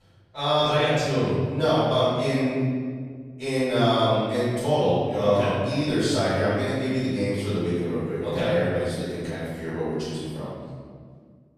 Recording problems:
room echo; strong; dies away in 1.8 s
off-mic speech; far

